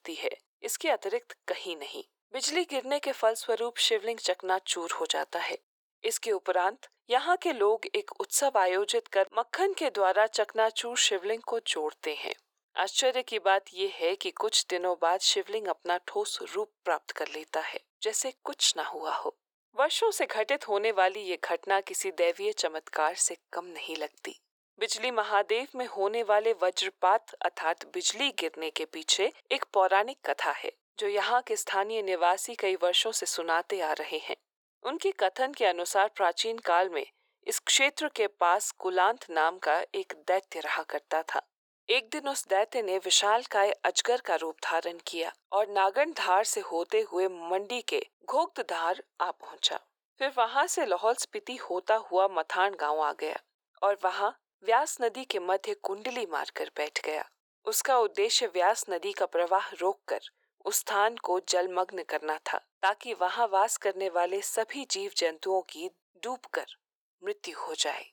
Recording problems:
thin; very; fading below 400 Hz

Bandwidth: 18.5 kHz